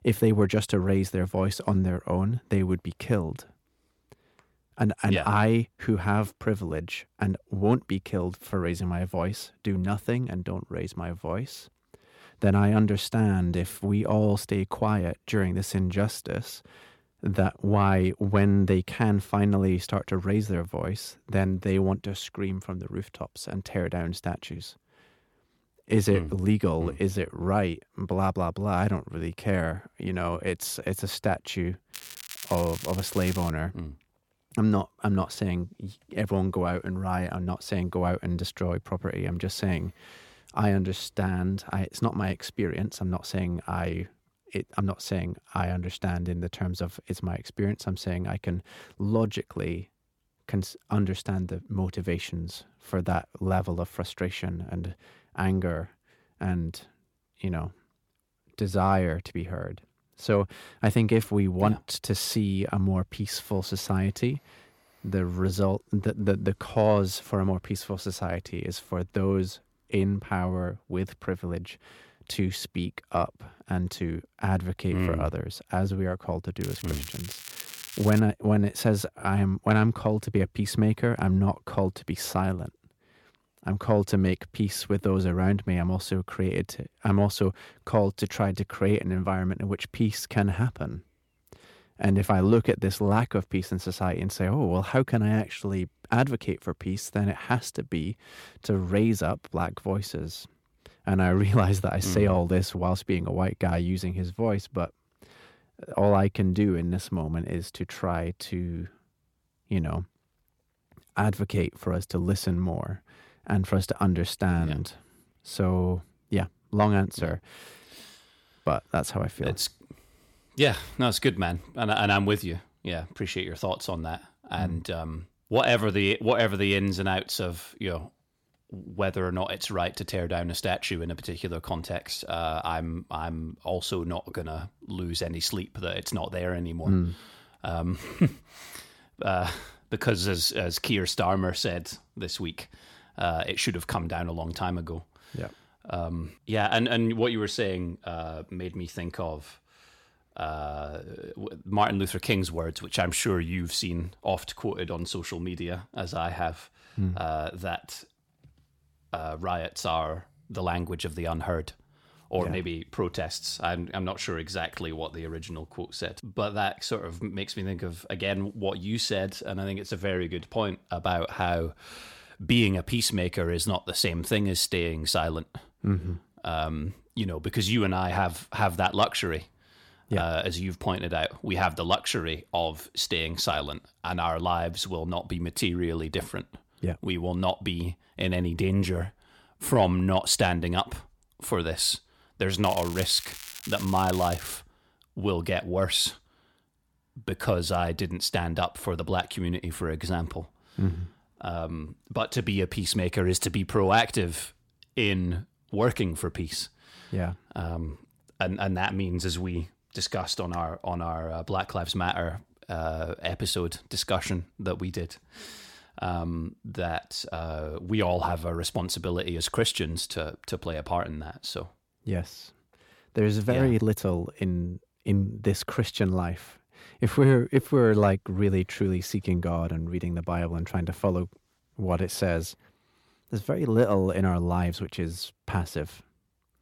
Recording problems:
crackling; noticeable; from 32 to 34 s, from 1:17 to 1:18 and from 3:13 to 3:15; 10 dB below the speech

